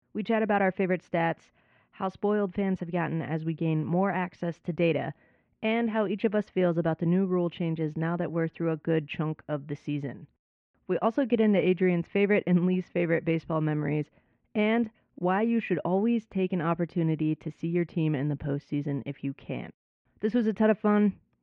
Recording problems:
muffled; very; fading above 2.5 kHz

